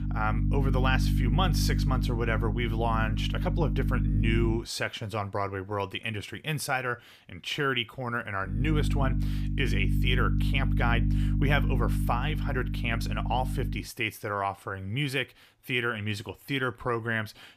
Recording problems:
electrical hum; loud; until 4.5 s and from 8.5 to 14 s; 50 Hz, 9 dB below the speech

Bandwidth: 15 kHz